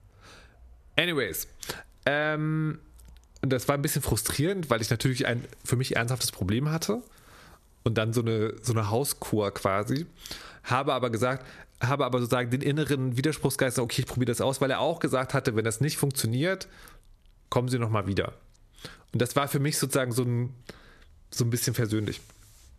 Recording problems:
squashed, flat; somewhat

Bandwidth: 14 kHz